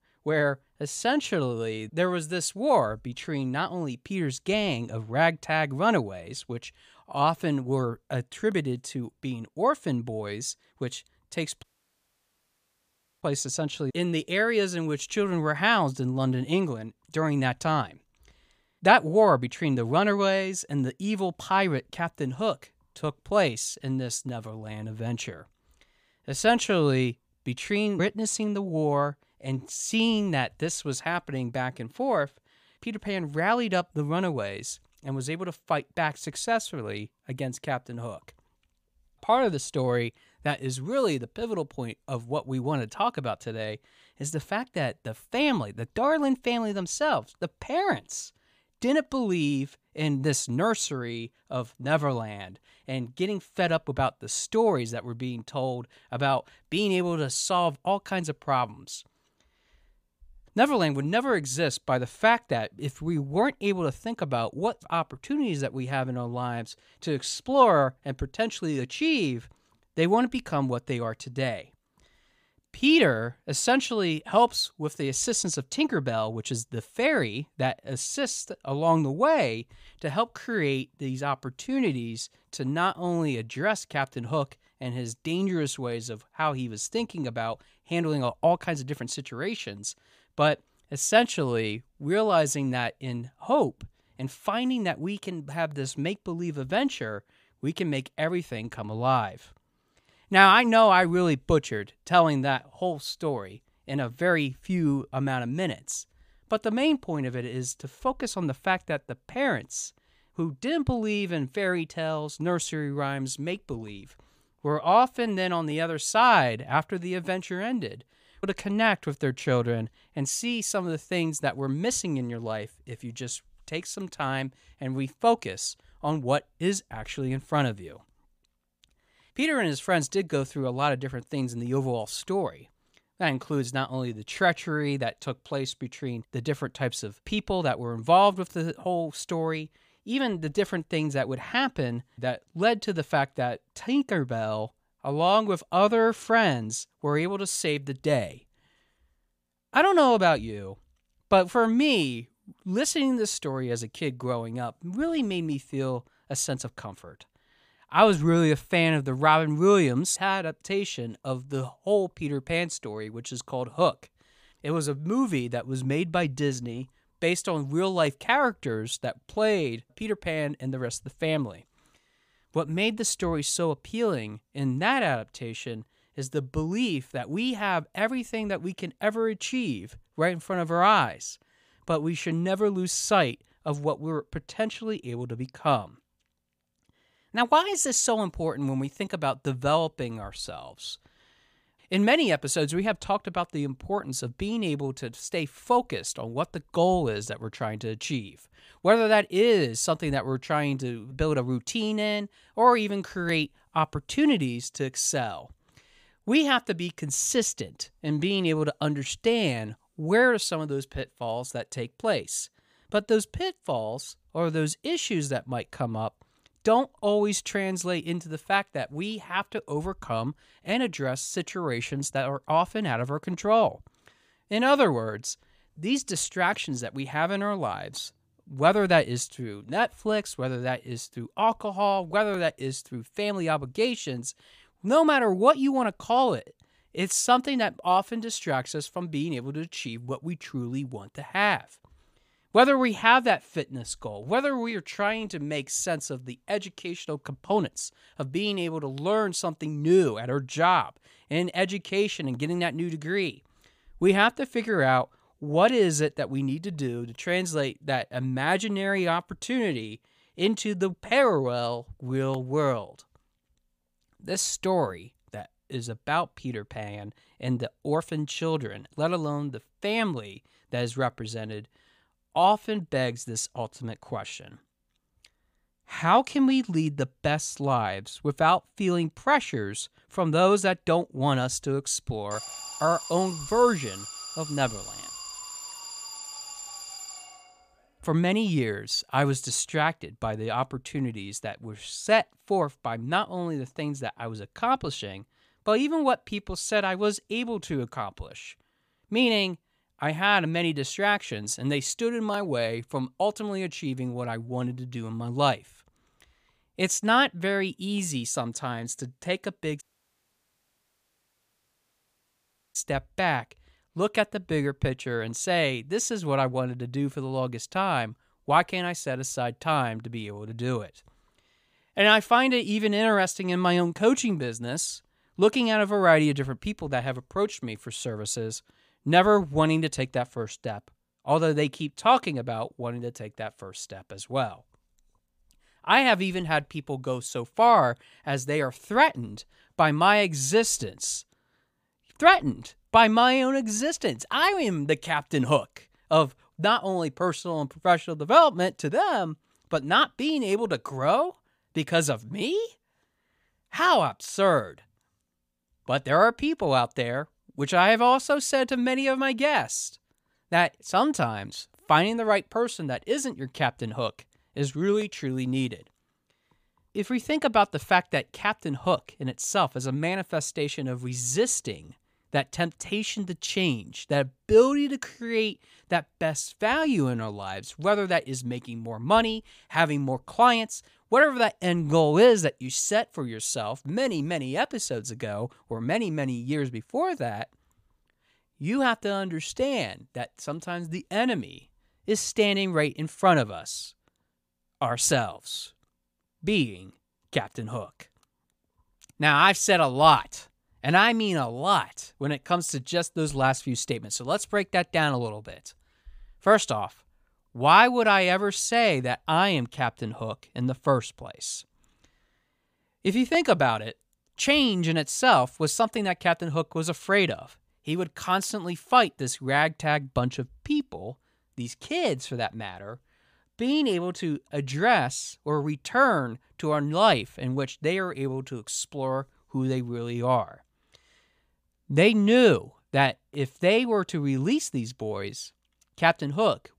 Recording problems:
audio cutting out; at 12 s for 1.5 s and at 5:10 for 3 s
alarm; noticeable; from 4:42 to 4:48; peak 10 dB below the speech

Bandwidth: 15 kHz